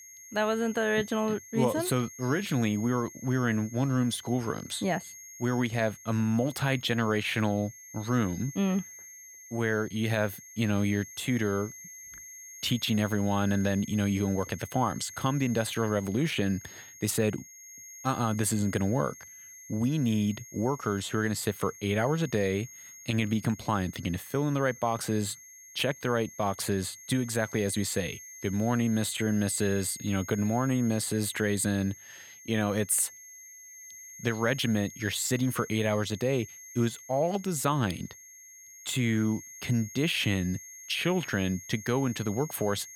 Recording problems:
high-pitched whine; noticeable; throughout; 6.5 kHz, 15 dB below the speech

